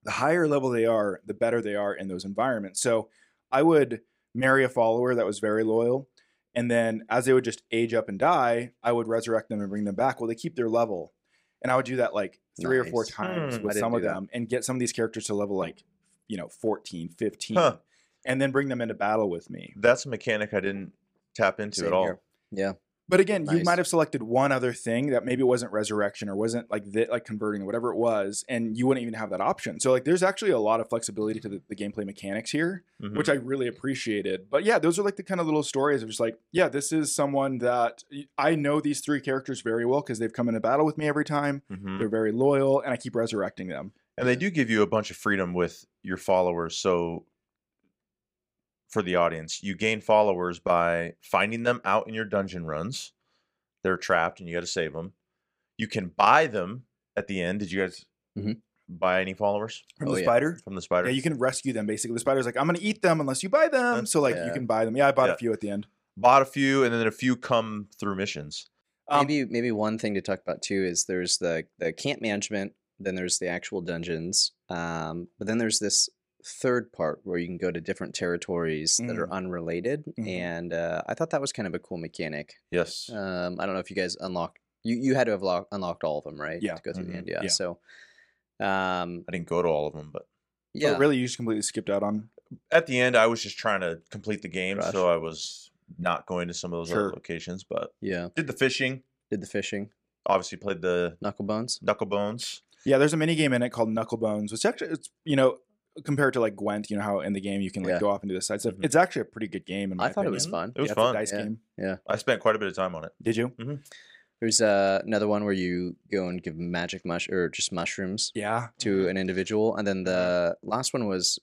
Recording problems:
none

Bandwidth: 15.5 kHz